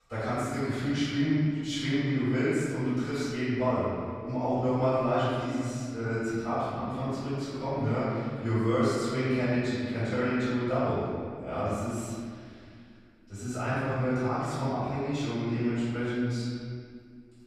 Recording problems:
room echo; strong; dies away in 2 s
off-mic speech; far

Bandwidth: 14.5 kHz